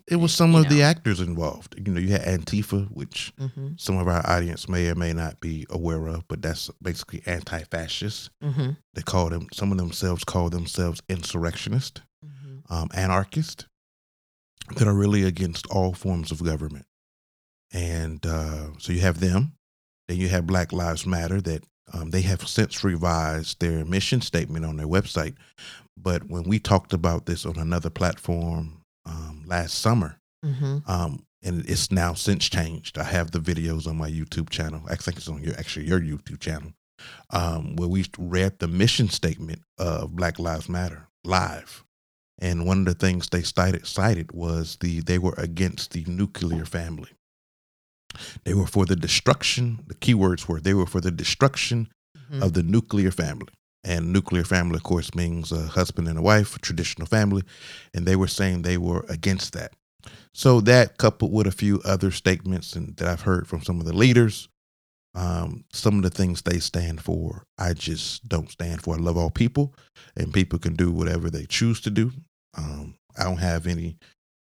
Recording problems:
none

